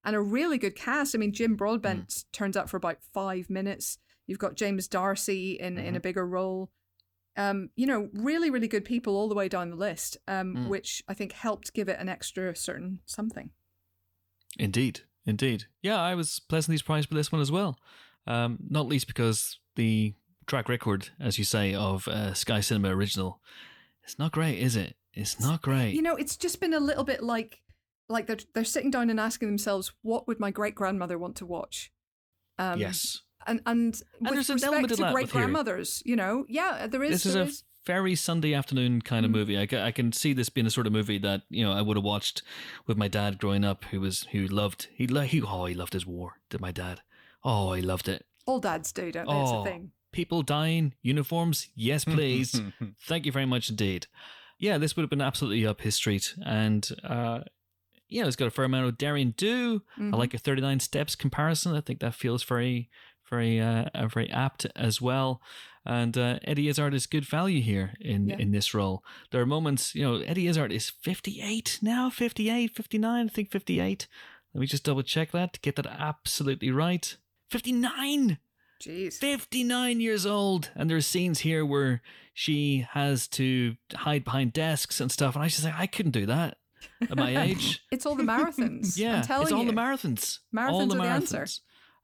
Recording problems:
none

